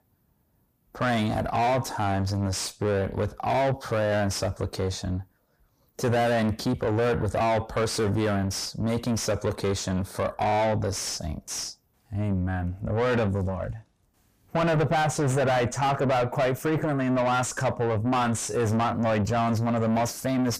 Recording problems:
distortion; heavy; 6 dB below the speech

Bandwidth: 15 kHz